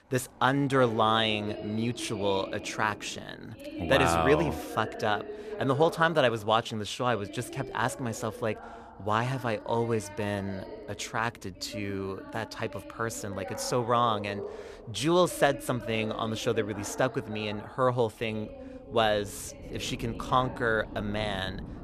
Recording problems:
voice in the background; noticeable; throughout; 15 dB below the speech

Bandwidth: 14.5 kHz